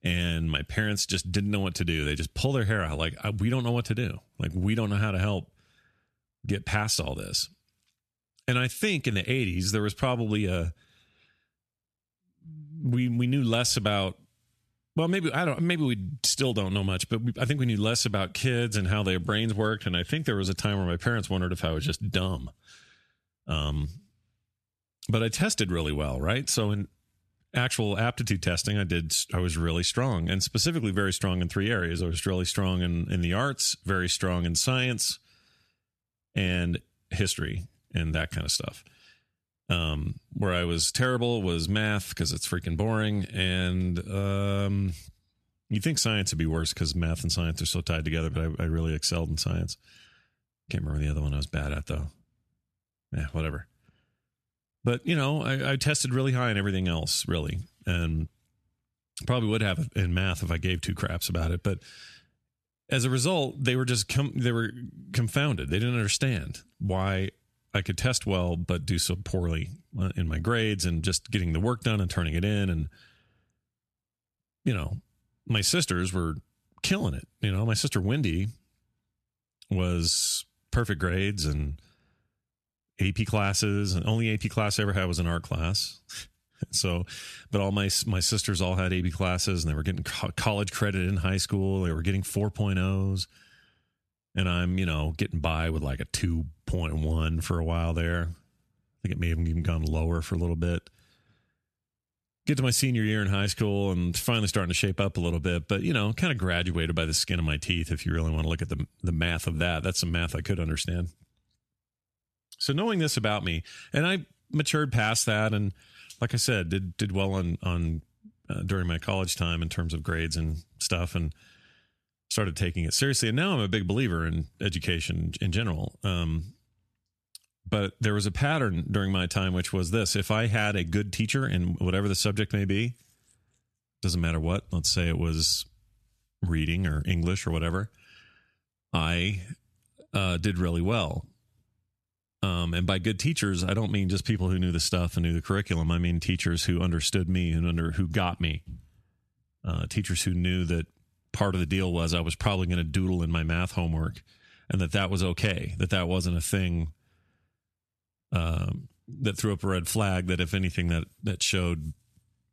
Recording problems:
squashed, flat; somewhat

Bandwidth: 13.5 kHz